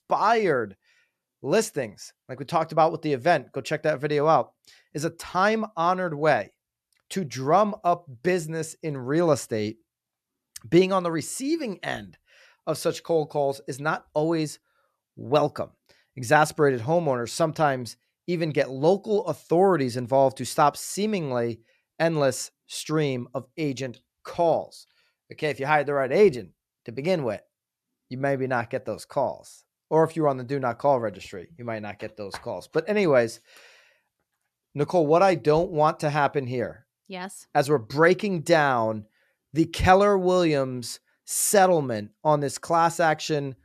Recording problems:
none

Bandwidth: 14 kHz